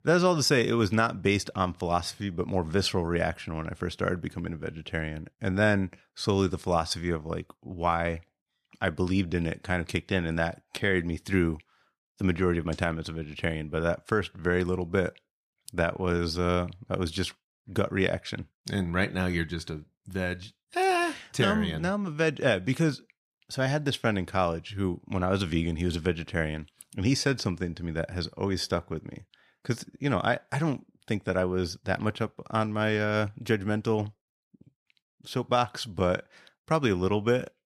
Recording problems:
none

